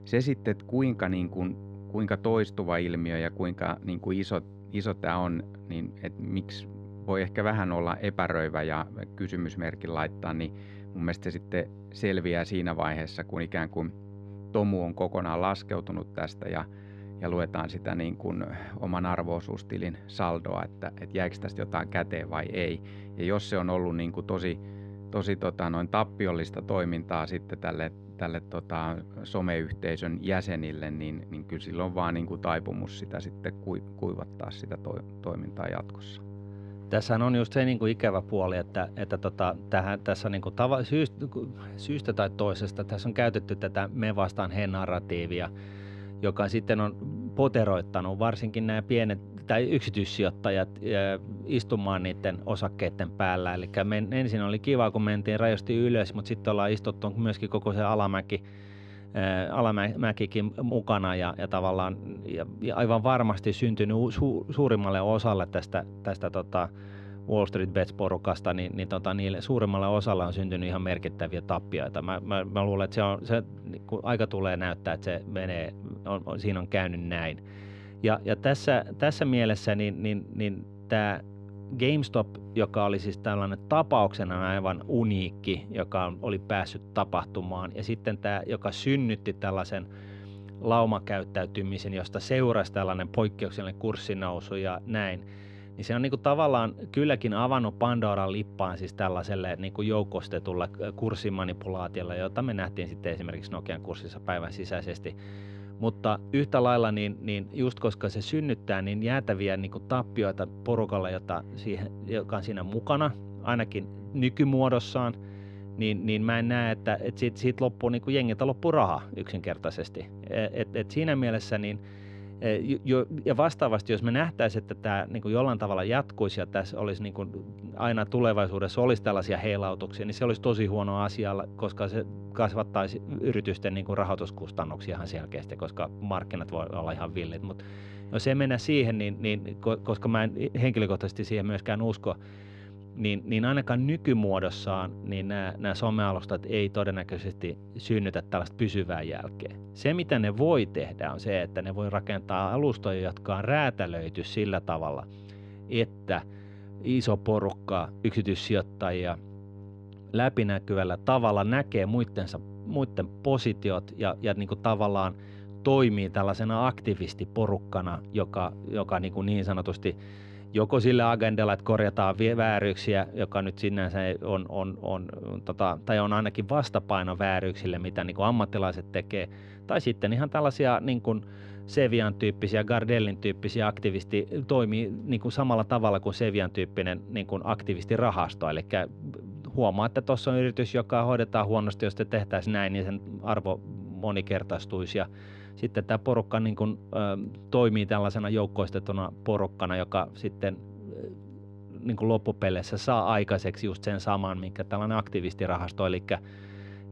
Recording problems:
muffled; slightly; fading above 2.5 kHz
electrical hum; faint; throughout; 50 Hz, 20 dB below the speech

